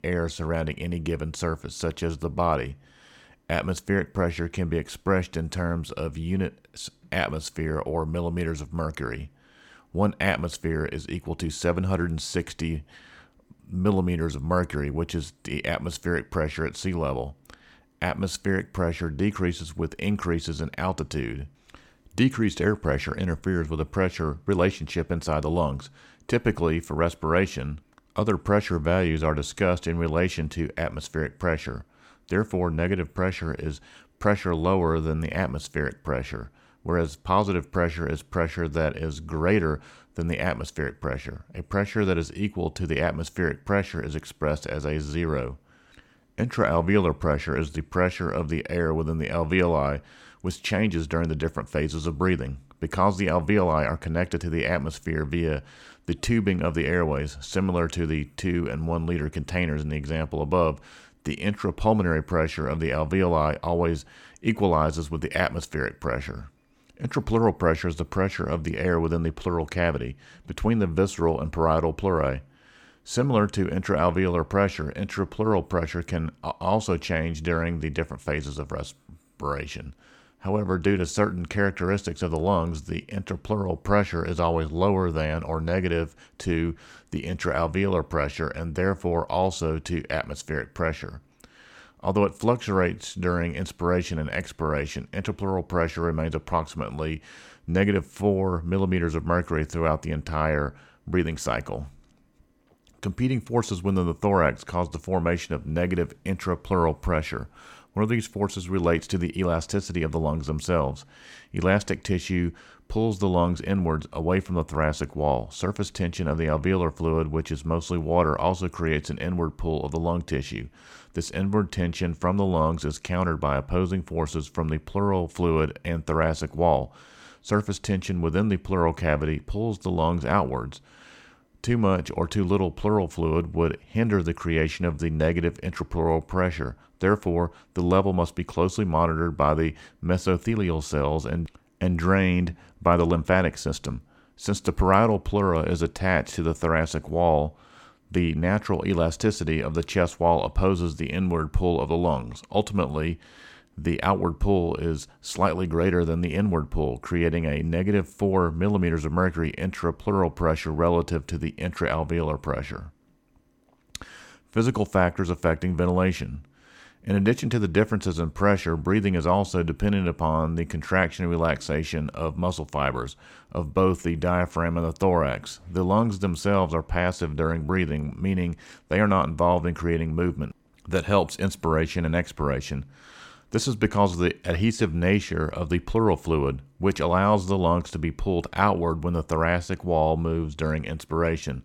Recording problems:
none

